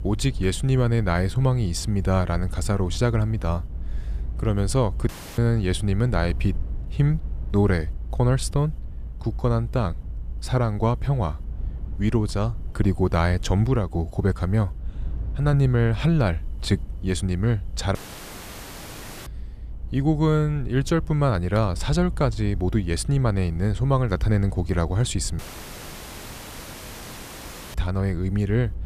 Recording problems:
low rumble; faint; throughout; 25 dB below the speech
audio cutting out; at 5 s, at 18 s for 1.5 s and at 25 s for 2.5 s

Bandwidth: 14.5 kHz